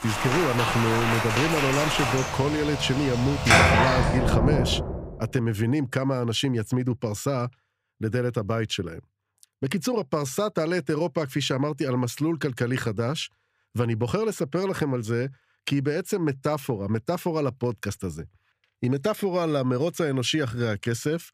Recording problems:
rain or running water; very loud; until 5 s; 3 dB above the speech

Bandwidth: 15 kHz